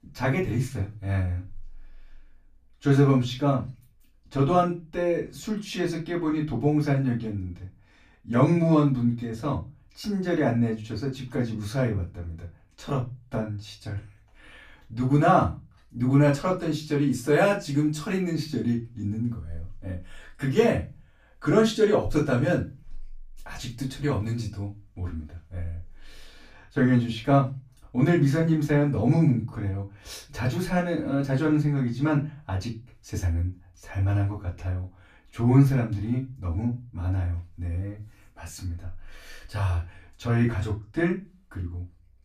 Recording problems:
off-mic speech; far
room echo; very slight; dies away in 0.2 s

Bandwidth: 14.5 kHz